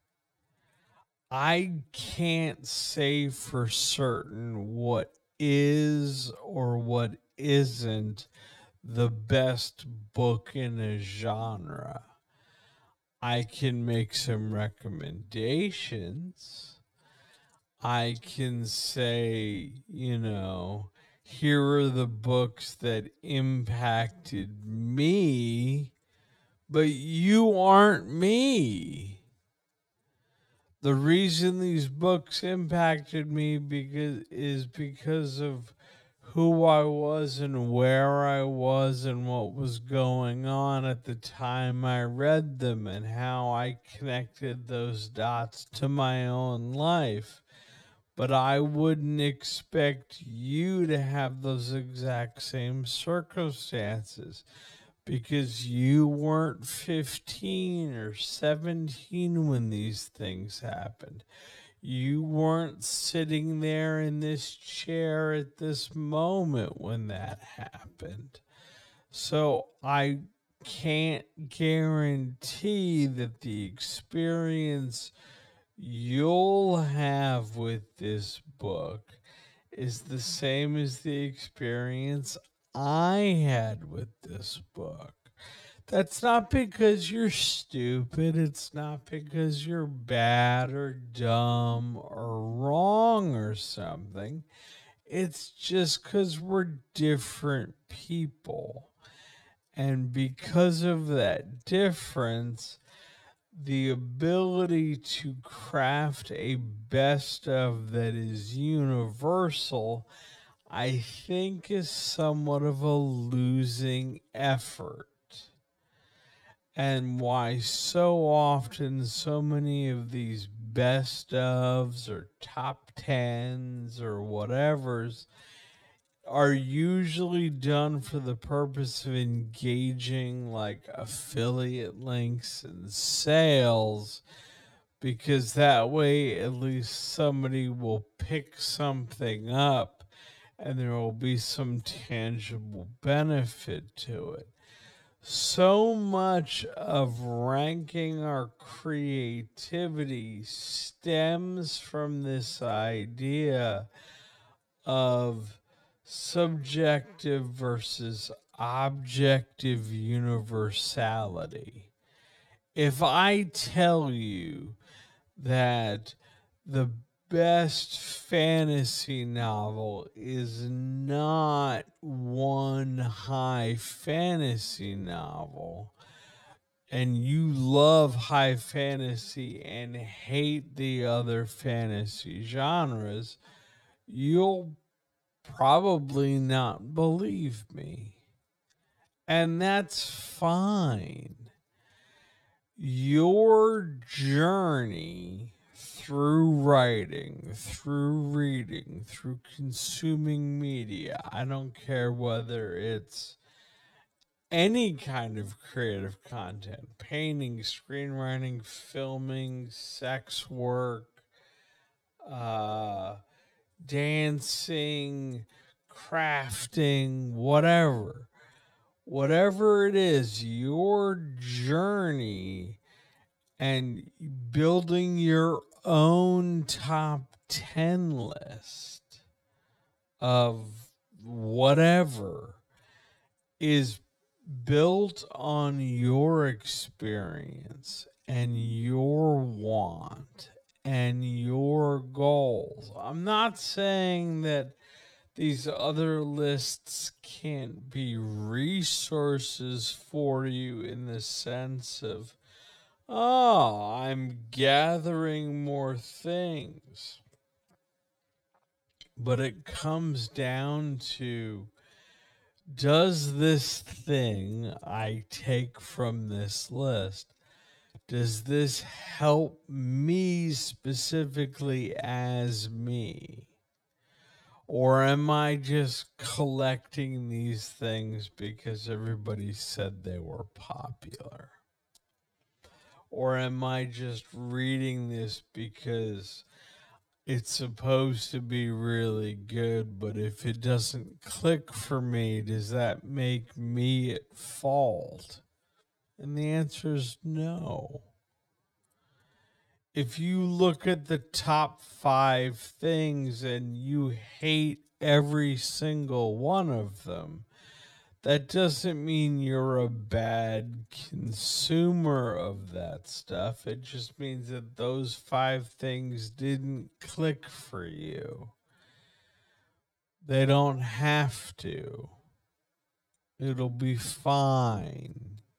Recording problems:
wrong speed, natural pitch; too slow; 0.5 times normal speed

